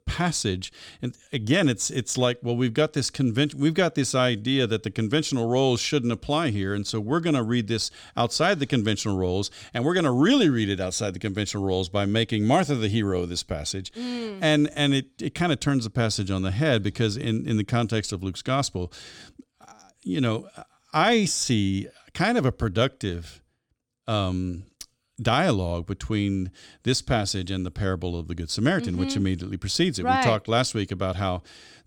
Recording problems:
none

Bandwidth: 17.5 kHz